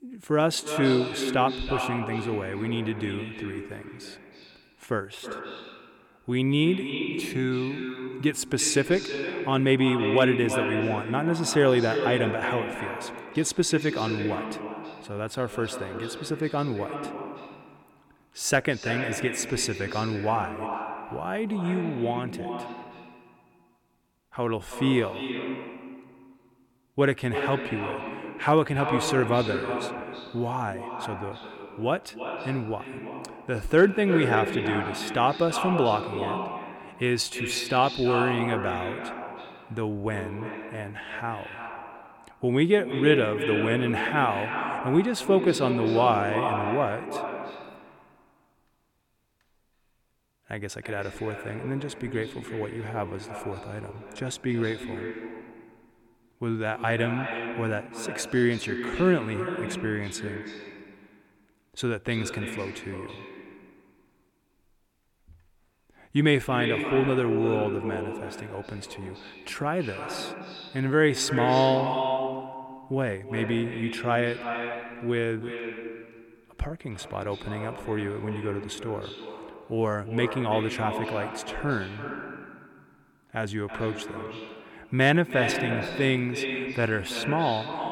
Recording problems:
echo of what is said; strong; throughout; 320 ms later, 6 dB below the speech

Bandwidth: 17.5 kHz